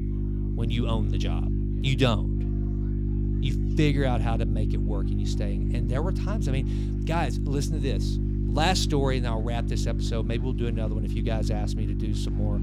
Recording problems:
electrical hum; loud; throughout; 50 Hz, 6 dB below the speech
murmuring crowd; faint; throughout; 30 dB below the speech

